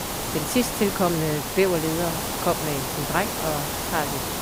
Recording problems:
hiss; loud; throughout; 1 dB below the speech

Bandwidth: 15.5 kHz